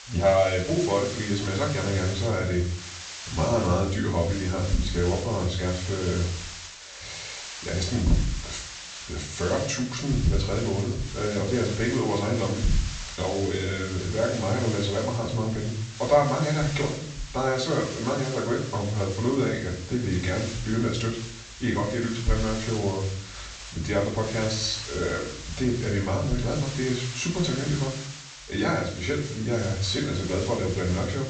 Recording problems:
off-mic speech; far
high frequencies cut off; noticeable; nothing above 8 kHz
room echo; slight; dies away in 0.5 s
hiss; noticeable; throughout; 10 dB below the speech

